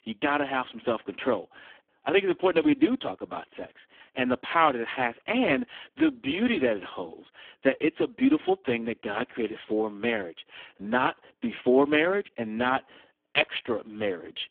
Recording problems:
phone-call audio; poor line

